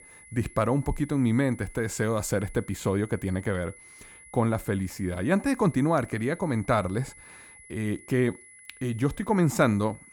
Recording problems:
high-pitched whine; faint; throughout; 2 kHz, 20 dB below the speech

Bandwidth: 18 kHz